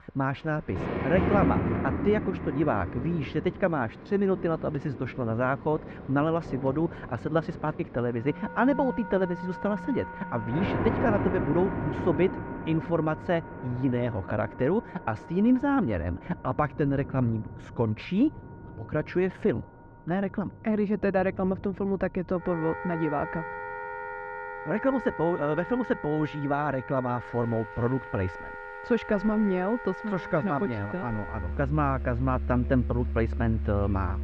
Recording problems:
muffled; very; fading above 2 kHz
rain or running water; loud; throughout; 7 dB below the speech
background music; loud; from 8.5 s on; 10 dB below the speech

